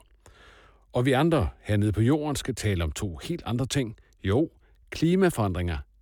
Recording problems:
none

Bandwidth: 18.5 kHz